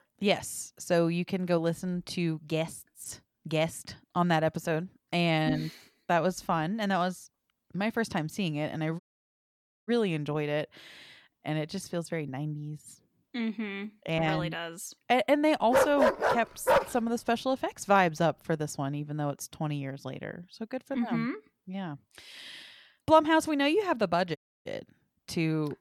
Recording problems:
audio cutting out; at 9 s for 1 s and at 24 s
dog barking; loud; from 16 to 17 s; peak 5 dB above the speech

